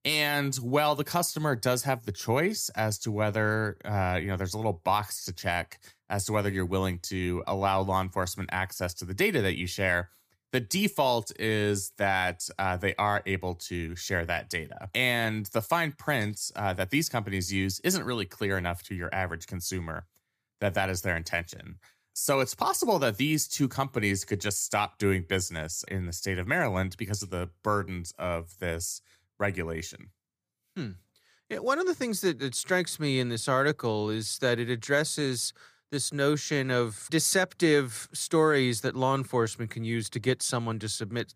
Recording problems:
none

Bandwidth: 15 kHz